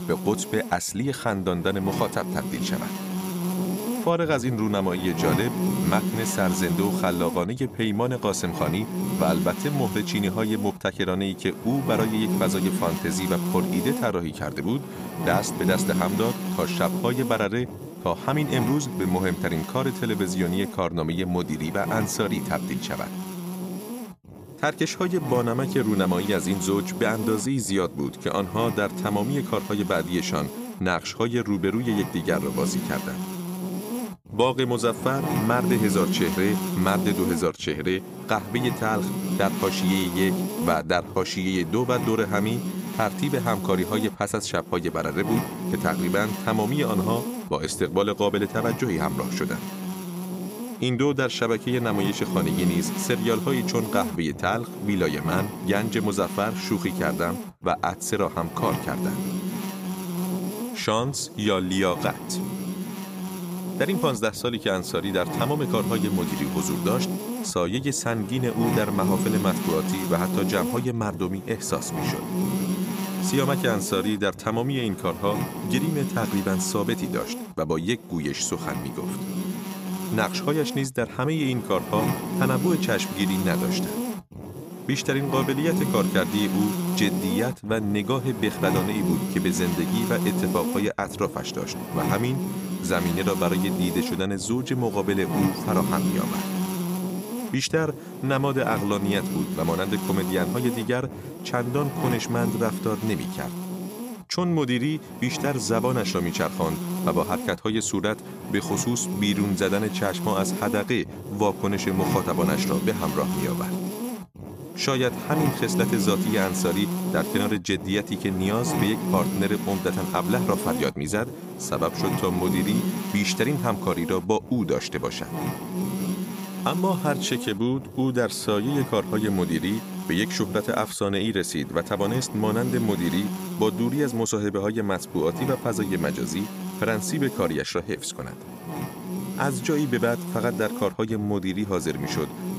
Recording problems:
electrical hum; loud; throughout; 50 Hz, 7 dB below the speech

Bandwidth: 15 kHz